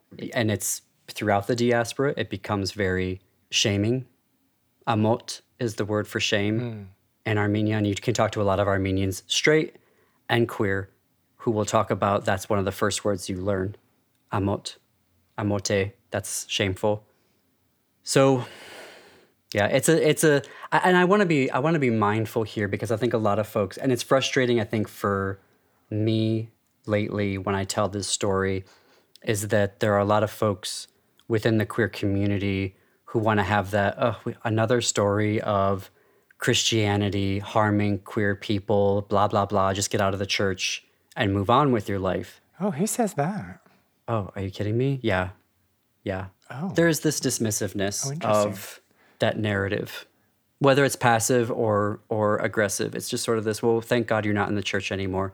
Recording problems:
none

